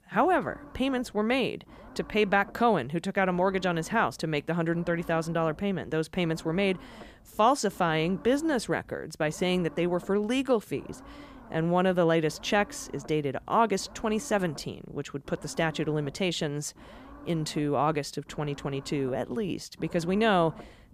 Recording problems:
low rumble; faint; throughout; 20 dB below the speech

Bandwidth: 15 kHz